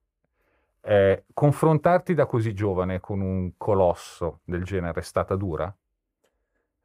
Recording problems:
muffled; slightly; fading above 2 kHz

